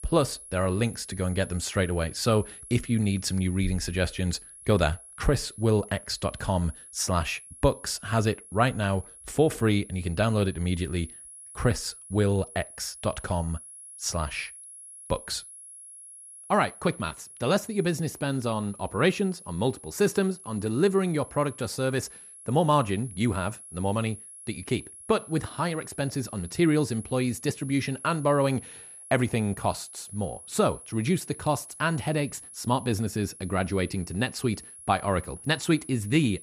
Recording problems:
high-pitched whine; noticeable; throughout; 10.5 kHz, 15 dB below the speech

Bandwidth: 14.5 kHz